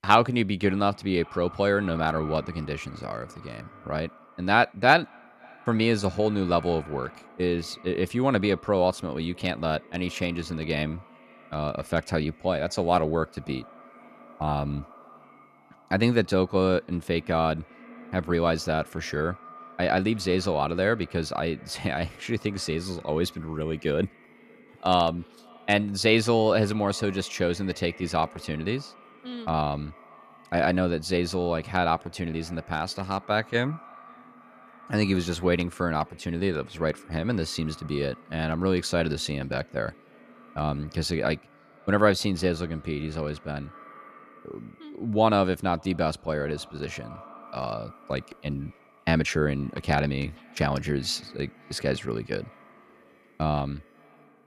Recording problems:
echo of what is said; faint; throughout; 540 ms later, 20 dB below the speech

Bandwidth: 14 kHz